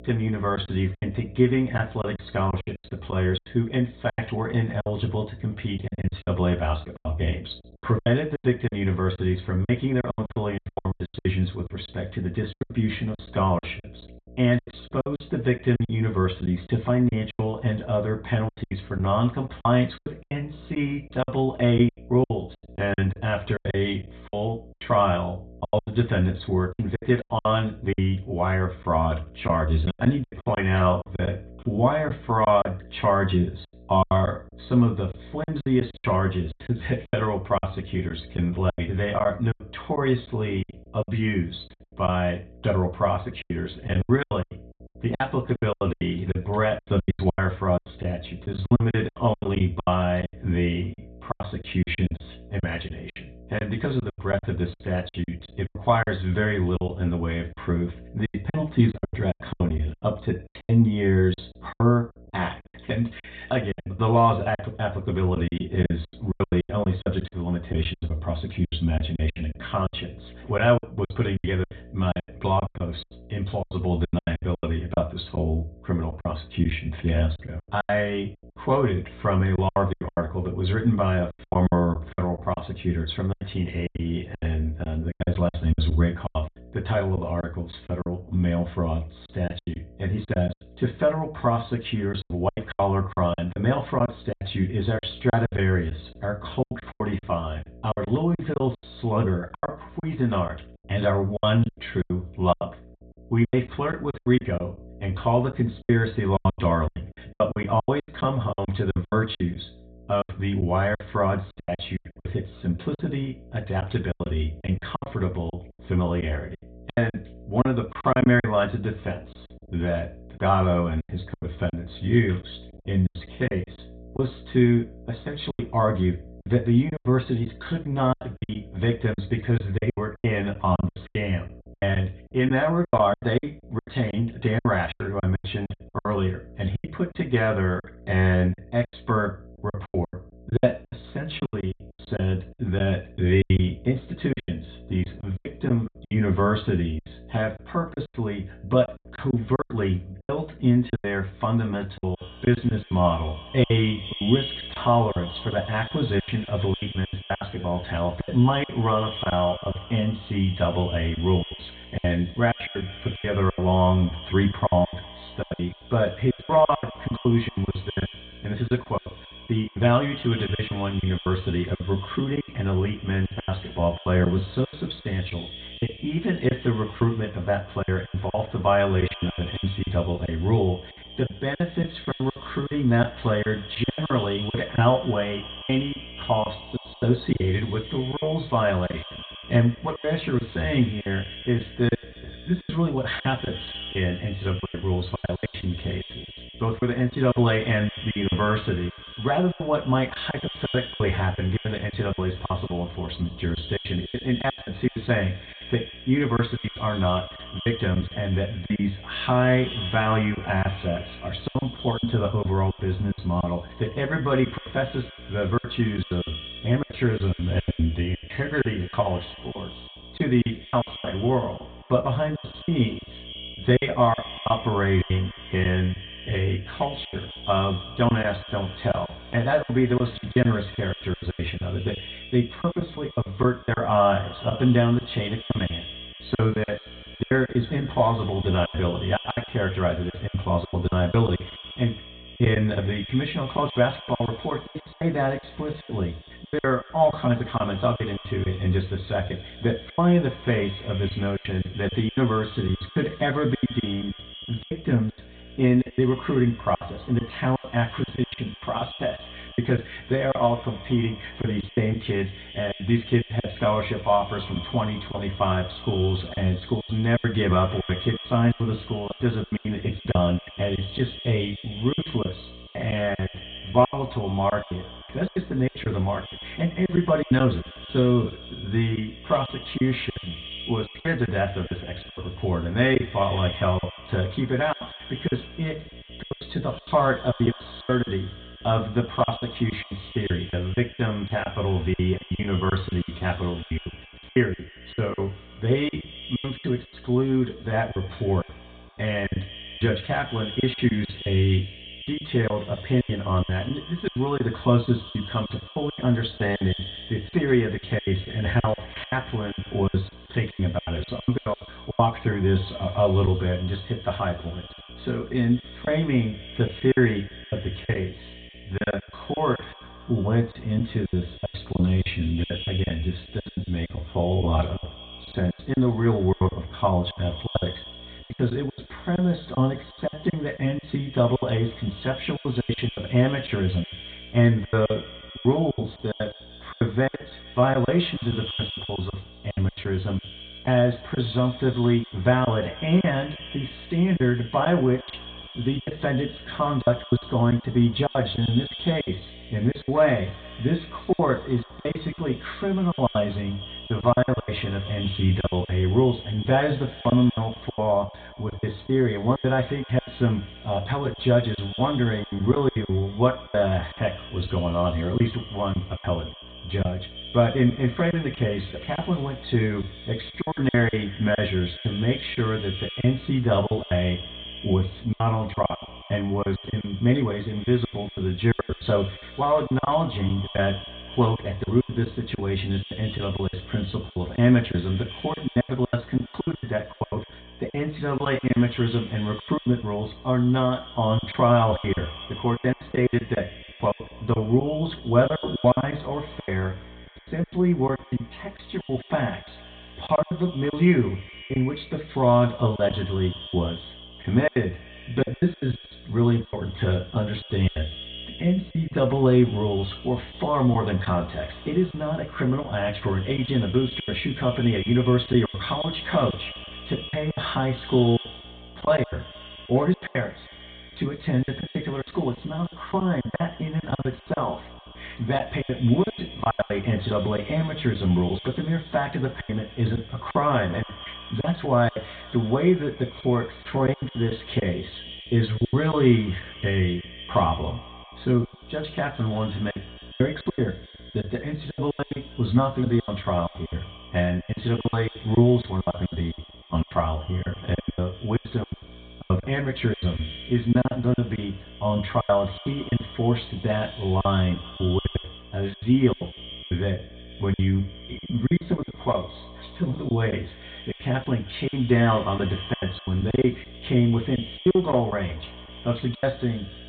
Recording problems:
off-mic speech; far
high frequencies cut off; severe; nothing above 4 kHz
echo of what is said; noticeable; from 2:32 on; 150 ms later, 15 dB below the speech
room echo; very slight; dies away in 0.3 s
electrical hum; faint; throughout; 60 Hz, 25 dB below the speech
choppy; very; 15% of the speech affected

